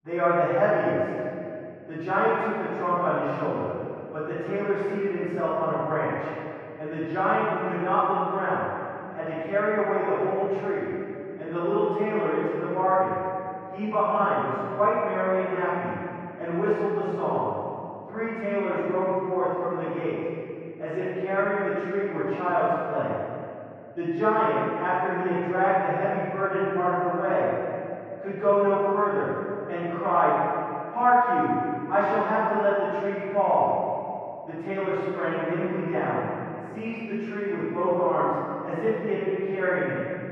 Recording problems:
room echo; strong; dies away in 2.5 s
off-mic speech; far
muffled; very; fading above 3.5 kHz

